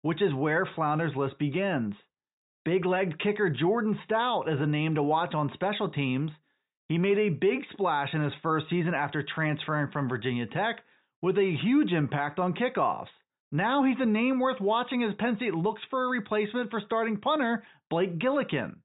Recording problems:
high frequencies cut off; severe; nothing above 4 kHz

